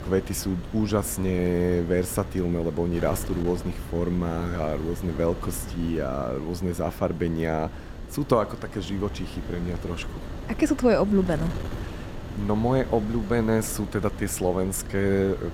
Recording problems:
wind noise on the microphone; occasional gusts; 15 dB below the speech

